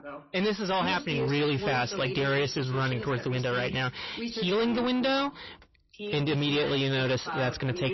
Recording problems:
distortion; heavy; 7 dB below the speech
garbled, watery; slightly; nothing above 6 kHz
voice in the background; loud; throughout; 9 dB below the speech

